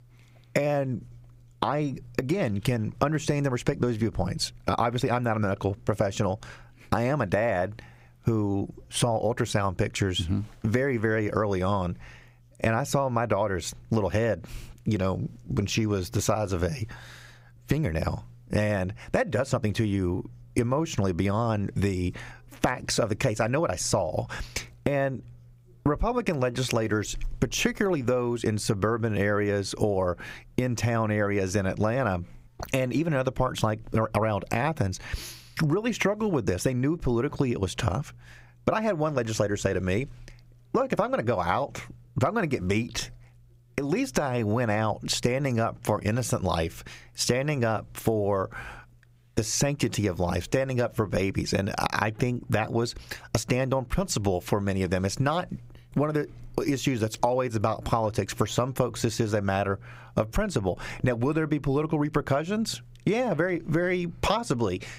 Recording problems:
squashed, flat; somewhat

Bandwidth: 15.5 kHz